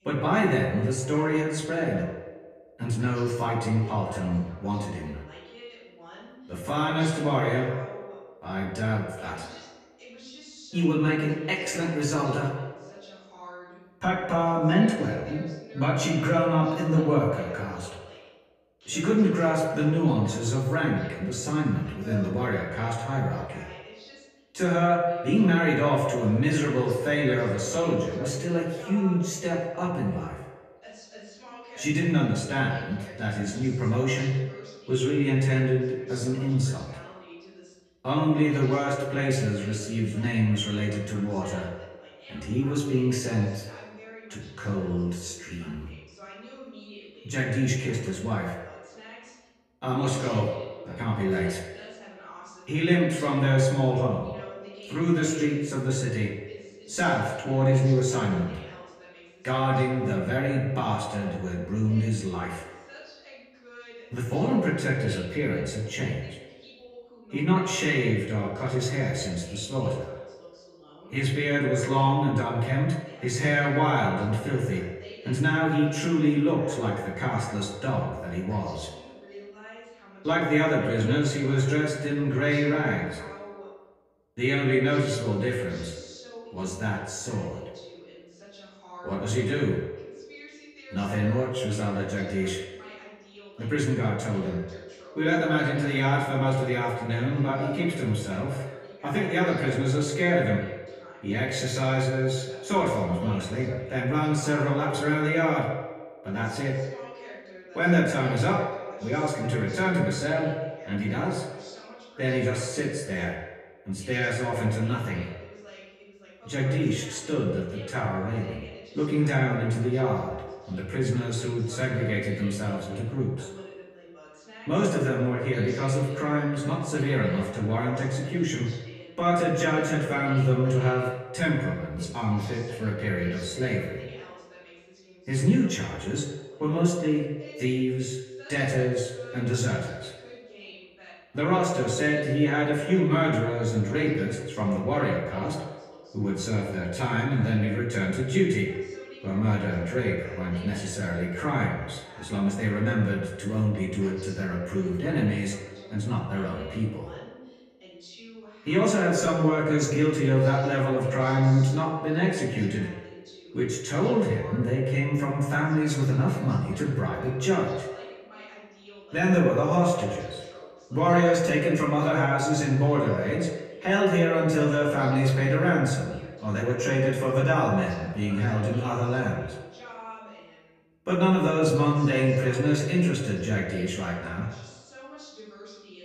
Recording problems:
echo of what is said; strong; throughout; 90 ms later, 7 dB below the speech
off-mic speech; far
room echo; slight; dies away in 0.4 s
voice in the background; faint; throughout; 20 dB below the speech

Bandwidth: 14.5 kHz